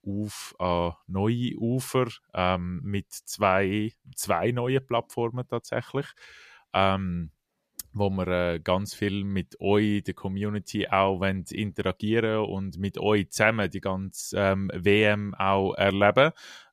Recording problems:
none

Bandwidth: 14.5 kHz